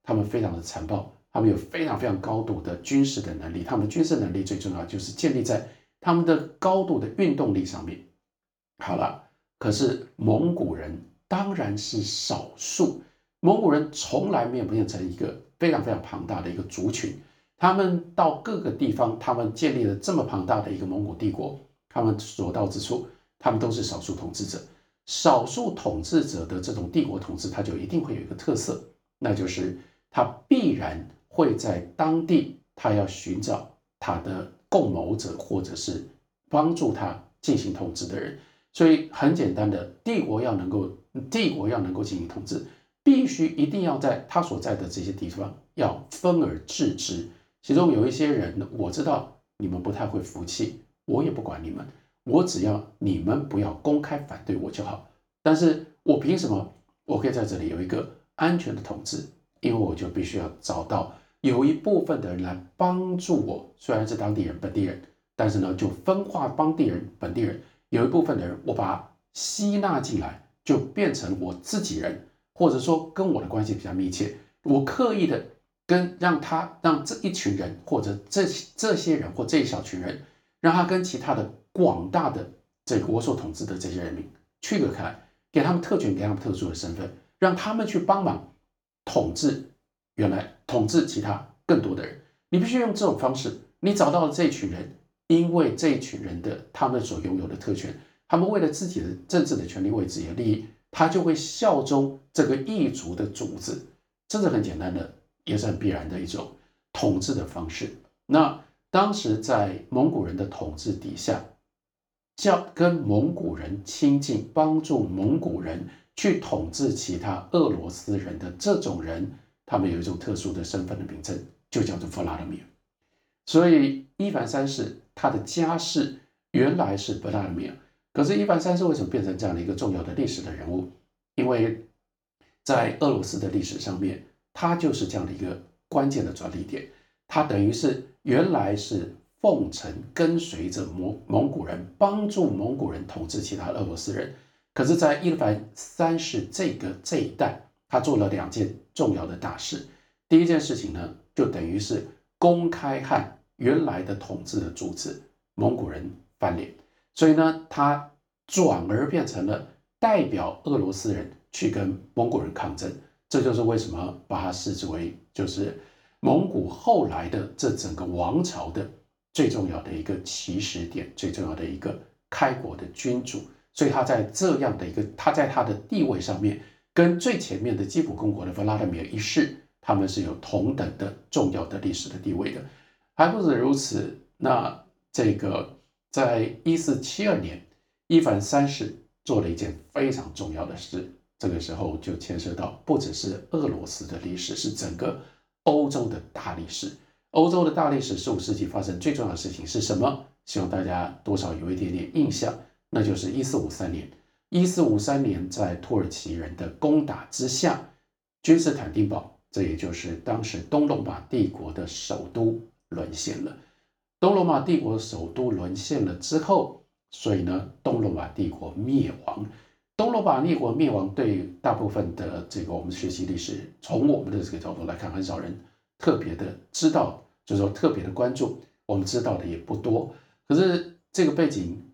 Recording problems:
room echo; slight; dies away in 0.3 s
off-mic speech; somewhat distant

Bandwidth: 18.5 kHz